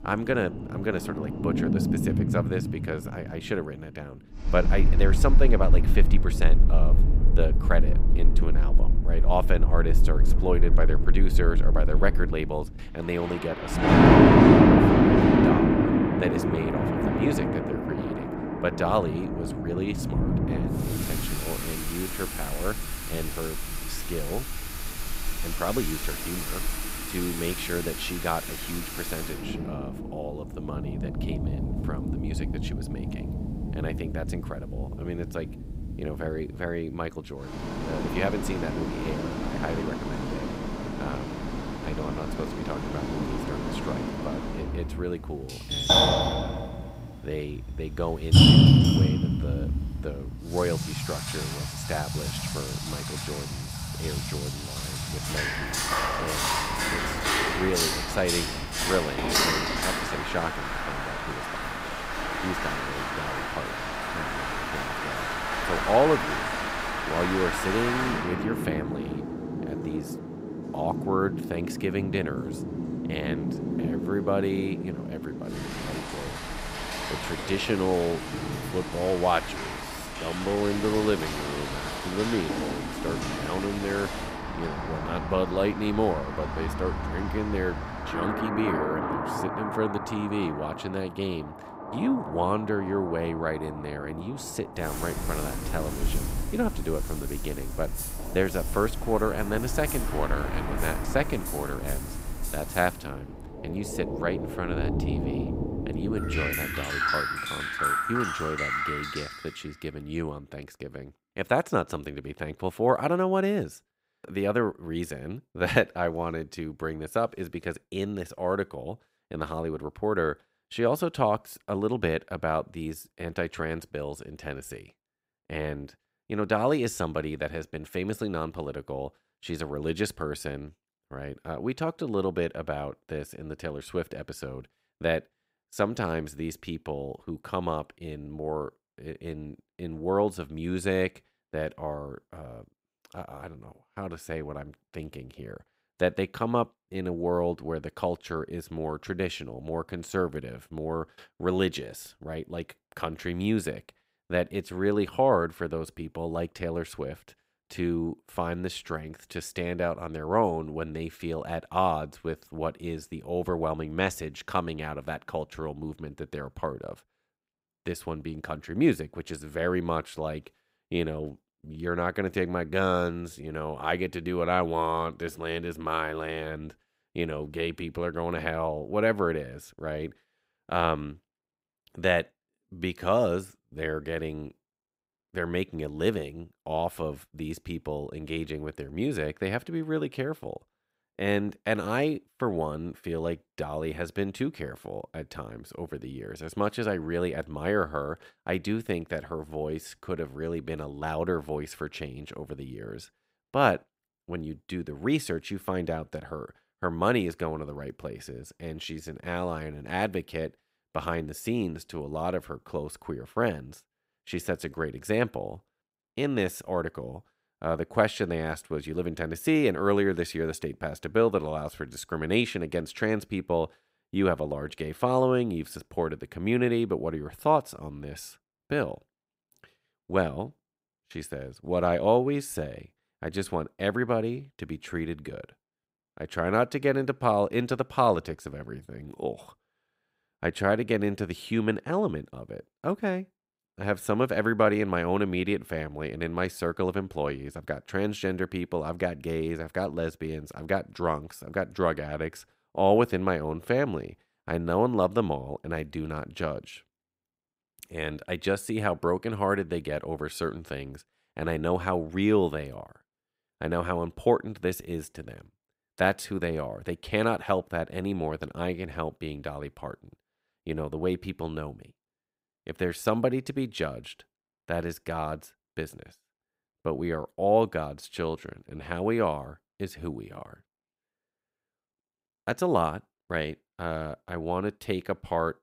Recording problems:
rain or running water; very loud; until 1:49; 3 dB above the speech

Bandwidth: 15.5 kHz